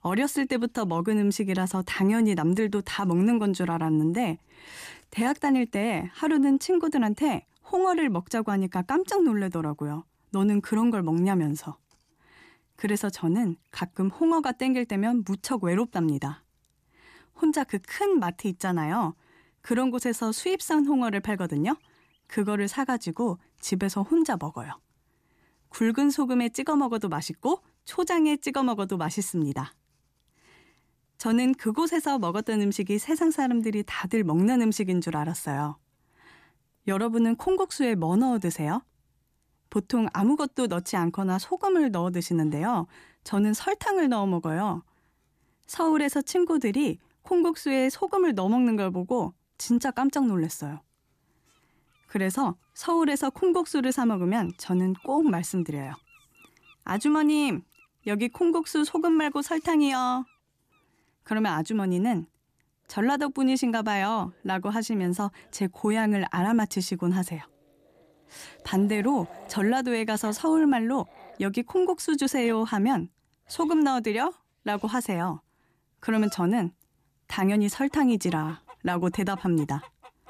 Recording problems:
animal sounds; faint; throughout; 30 dB below the speech

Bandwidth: 14.5 kHz